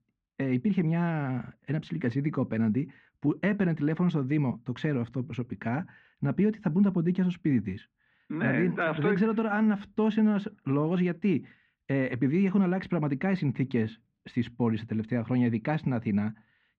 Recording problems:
muffled; very; fading above 2.5 kHz

